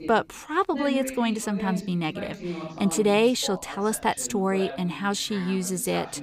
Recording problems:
voice in the background; noticeable; throughout; 10 dB below the speech

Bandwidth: 15.5 kHz